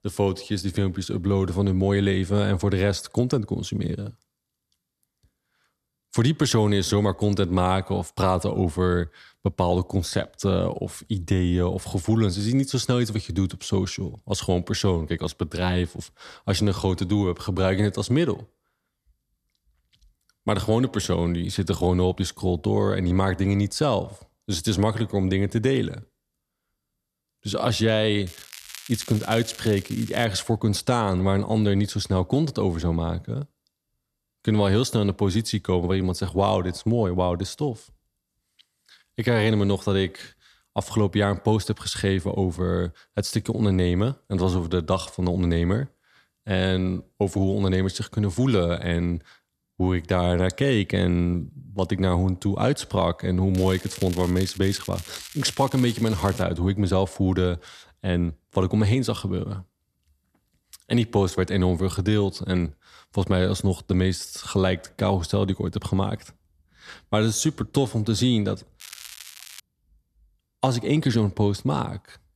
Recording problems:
crackling; noticeable; from 28 to 30 s, from 54 to 56 s and at 1:09; 15 dB below the speech

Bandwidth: 13.5 kHz